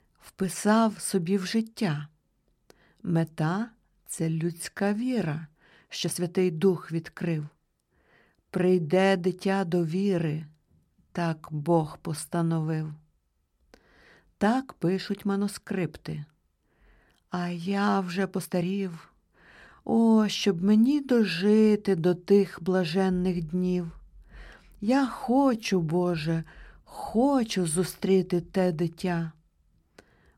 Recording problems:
uneven, jittery; strongly; from 4 to 27 s

